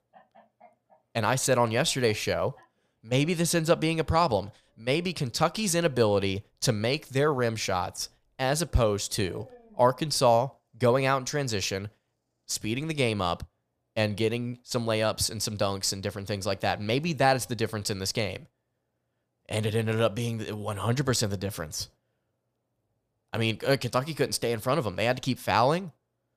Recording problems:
animal sounds; faint; until 13 s; 30 dB below the speech

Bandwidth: 15 kHz